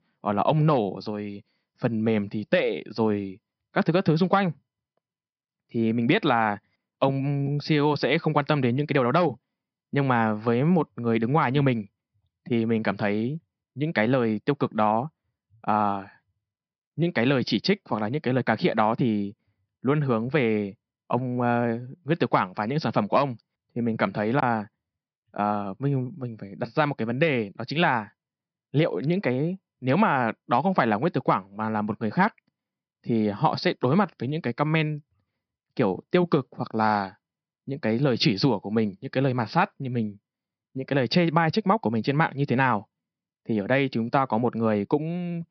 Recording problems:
high frequencies cut off; noticeable; nothing above 5.5 kHz

